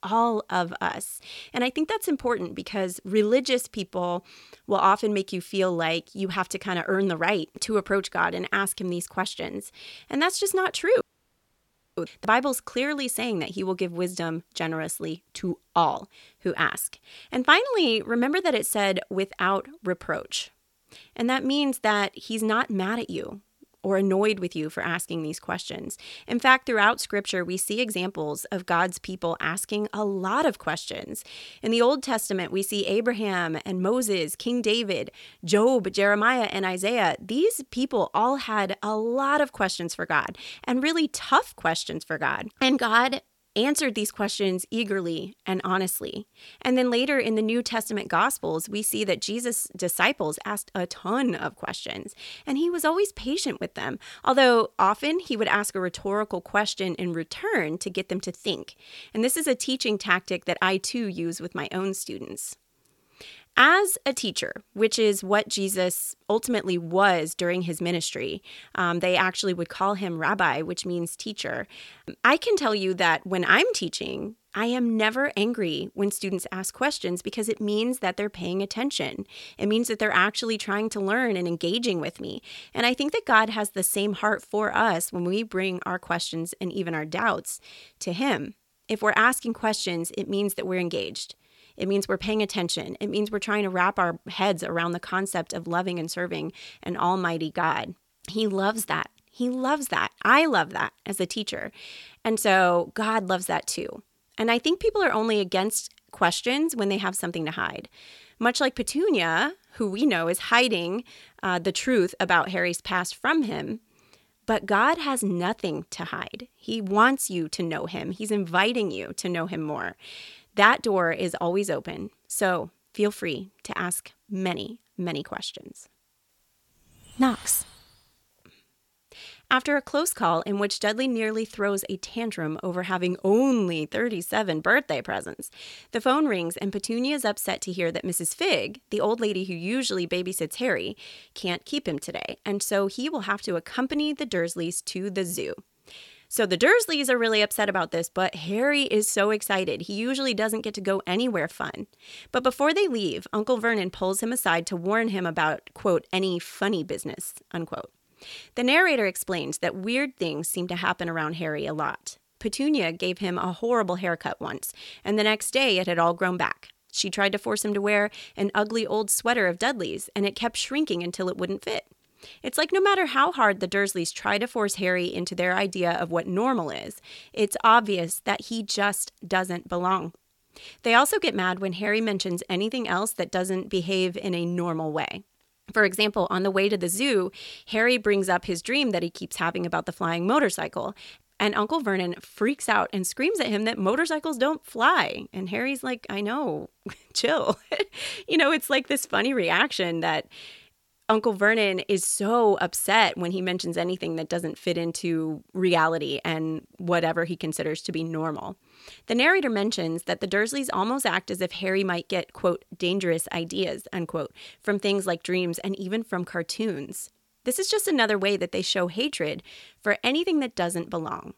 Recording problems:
audio cutting out; at 11 s for 1 s

